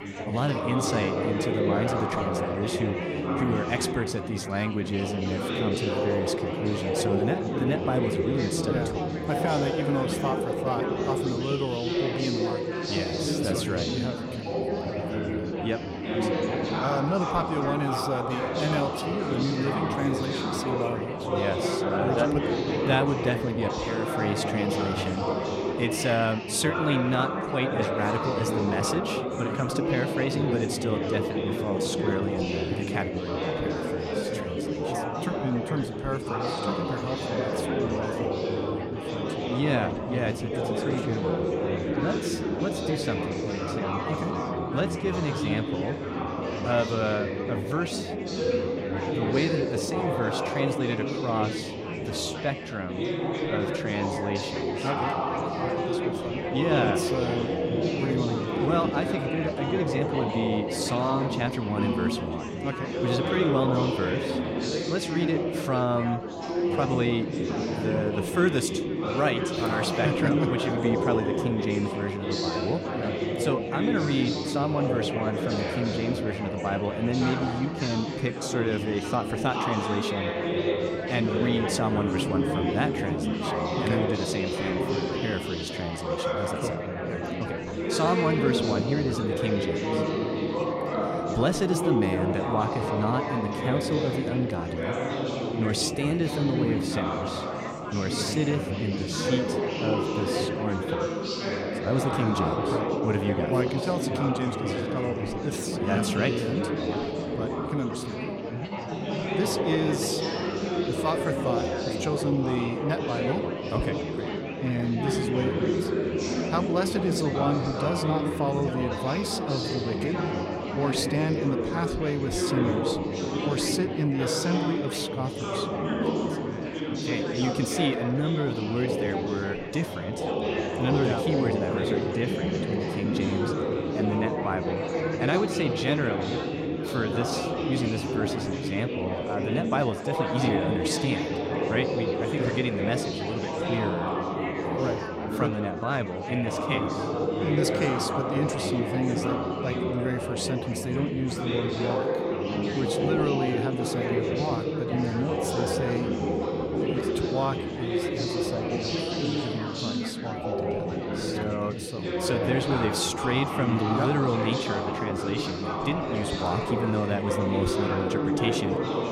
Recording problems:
chatter from many people; very loud; throughout; 1 dB above the speech

